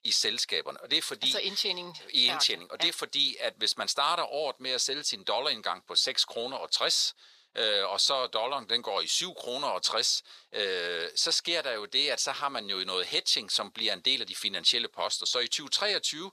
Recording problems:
thin; very; fading below 600 Hz

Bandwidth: 14.5 kHz